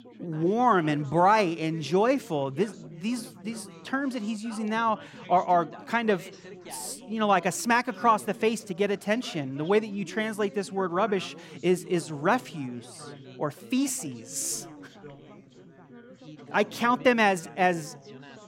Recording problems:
background chatter; noticeable; throughout; 4 voices, 20 dB below the speech

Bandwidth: 16 kHz